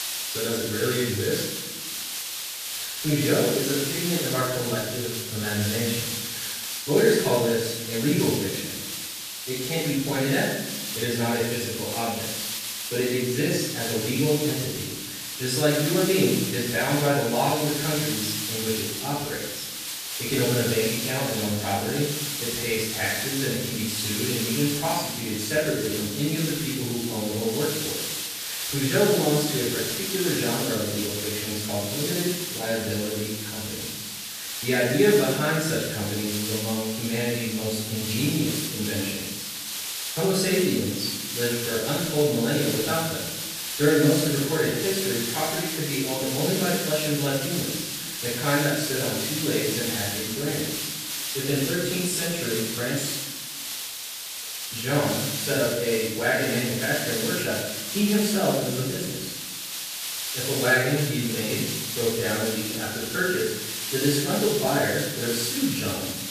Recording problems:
room echo; strong; dies away in 0.9 s
off-mic speech; far
hiss; loud; throughout; 3 dB below the speech

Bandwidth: 14.5 kHz